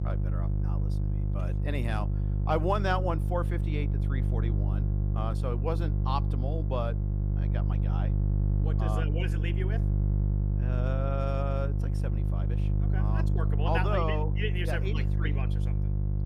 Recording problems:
electrical hum; loud; throughout; 50 Hz, 8 dB below the speech

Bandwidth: 15 kHz